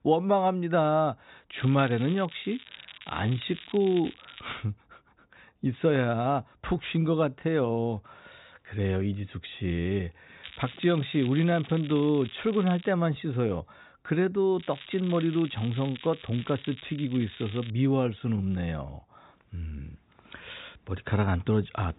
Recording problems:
high frequencies cut off; severe; nothing above 4 kHz
crackling; noticeable; from 1.5 to 4.5 s, from 10 to 13 s and from 15 to 18 s; 15 dB below the speech

